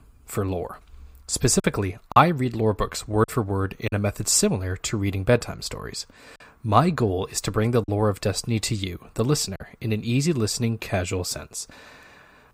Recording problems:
choppy; occasionally; 3% of the speech affected

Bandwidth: 15.5 kHz